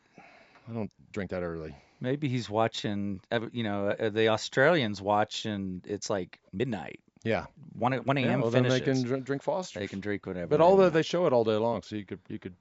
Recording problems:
high frequencies cut off; noticeable; nothing above 8 kHz
uneven, jittery; strongly; from 0.5 to 12 s

